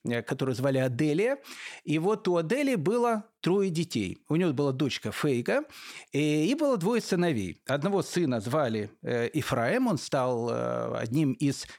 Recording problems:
none

